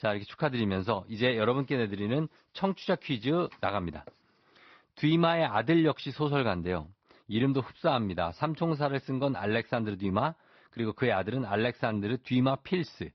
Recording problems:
high frequencies cut off; noticeable; nothing above 5.5 kHz
garbled, watery; slightly

